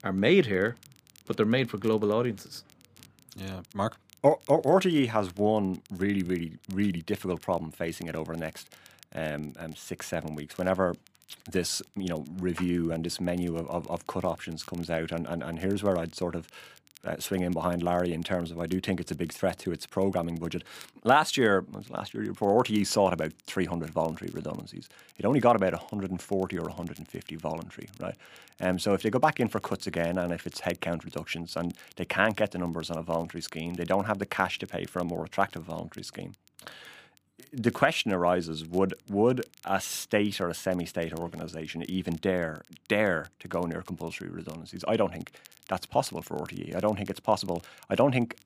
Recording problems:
crackle, like an old record; faint; 25 dB below the speech

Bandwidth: 15 kHz